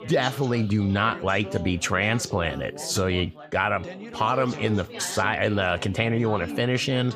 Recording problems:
background chatter; noticeable; throughout; 4 voices, 15 dB below the speech

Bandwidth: 15 kHz